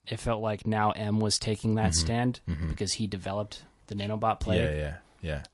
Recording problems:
garbled, watery; slightly

